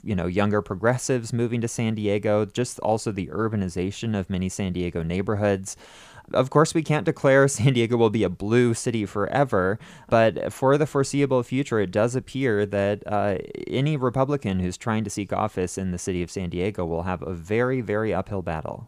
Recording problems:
none

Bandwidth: 15 kHz